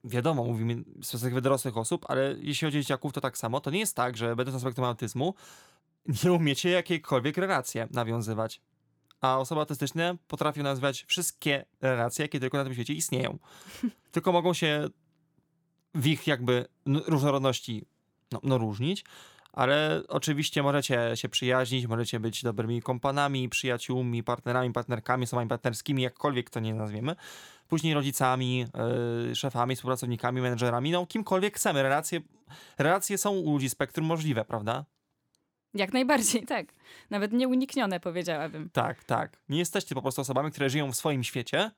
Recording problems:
none

